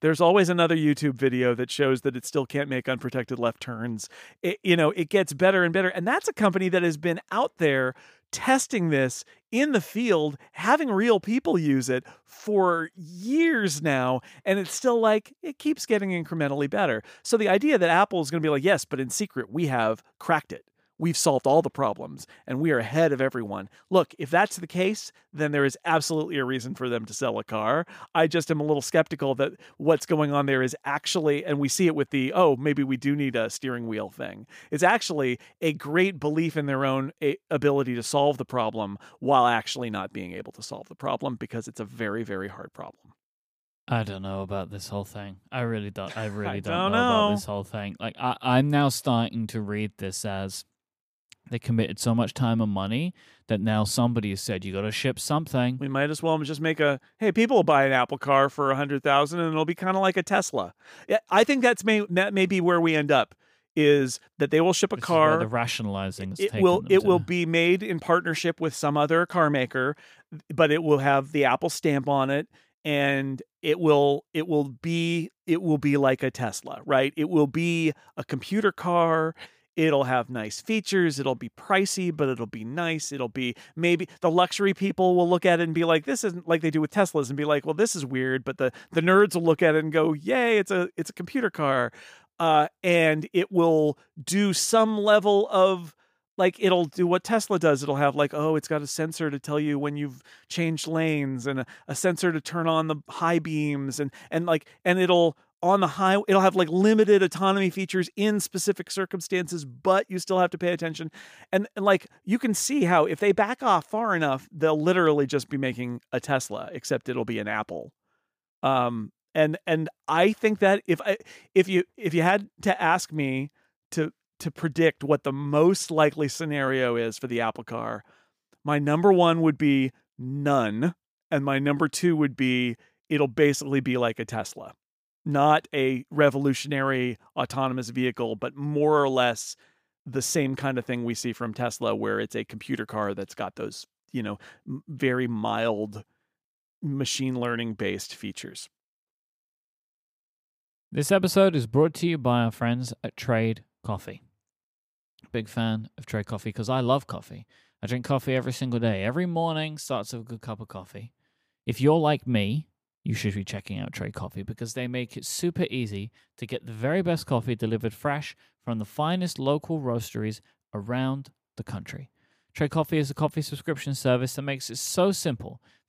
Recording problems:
none

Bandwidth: 15 kHz